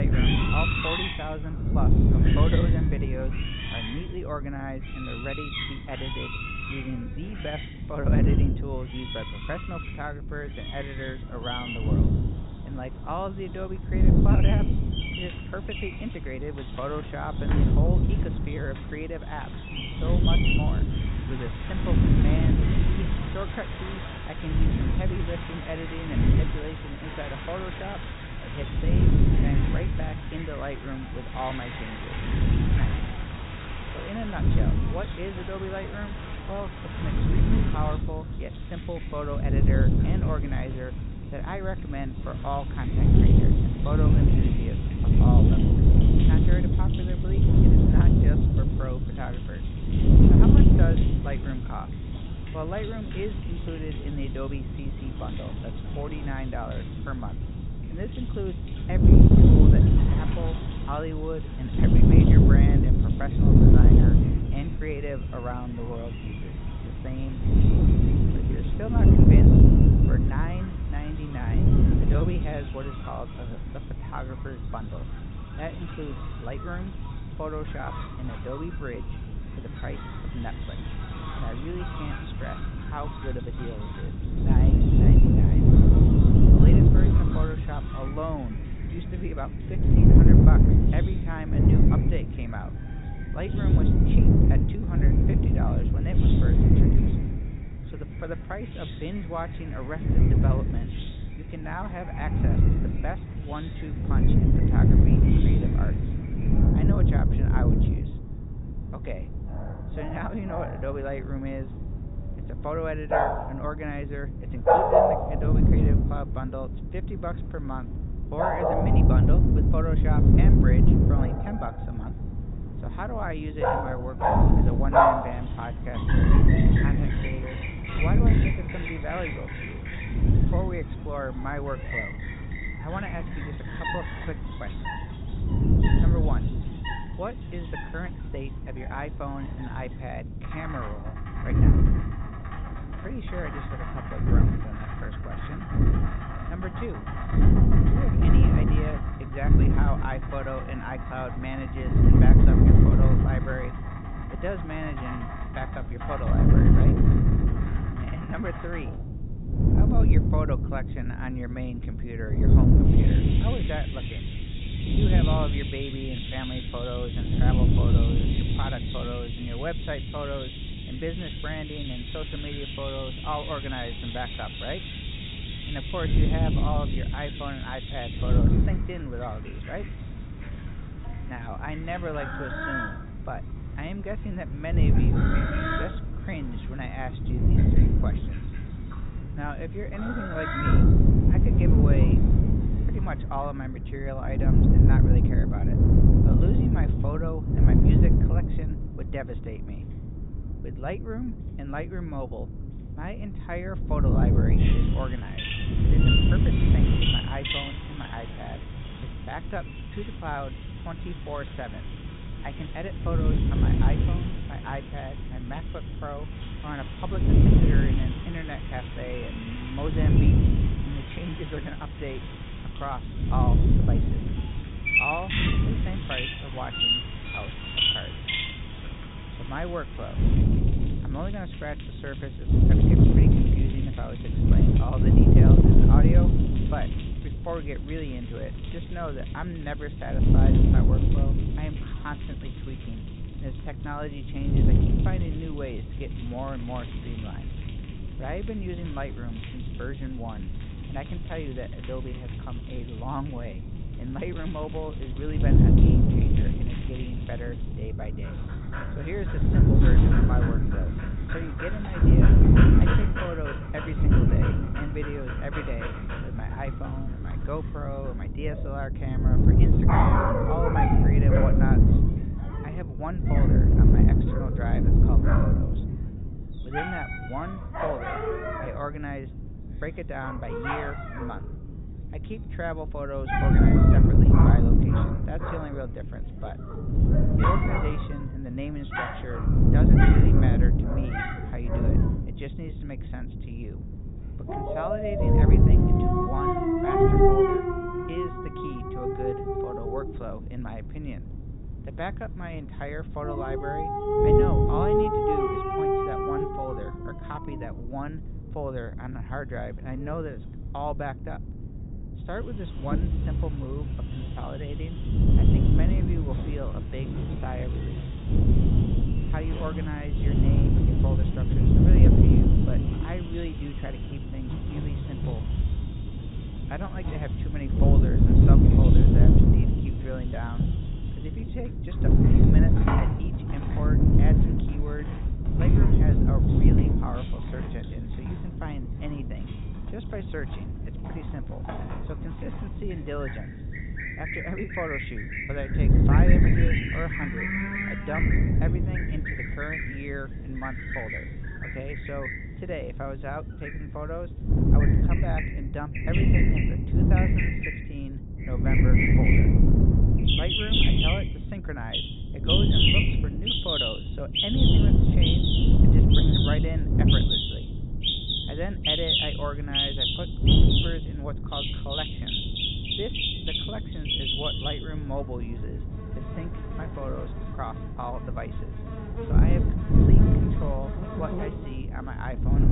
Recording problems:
high frequencies cut off; severe; nothing above 4 kHz
animal sounds; very loud; throughout; 4 dB above the speech
wind noise on the microphone; heavy; 3 dB above the speech
abrupt cut into speech; at the start and the end

